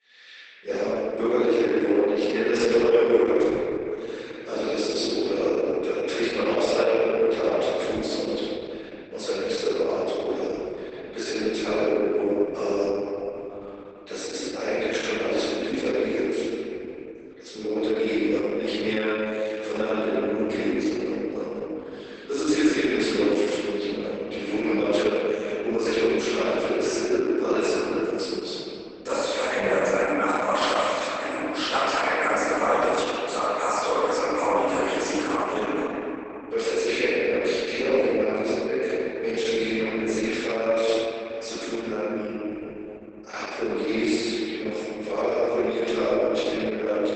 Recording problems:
room echo; strong; dies away in 3 s
off-mic speech; far
garbled, watery; badly; nothing above 8 kHz
thin; somewhat; fading below 300 Hz
echo of what is said; faint; throughout; 450 ms later, 25 dB below the speech

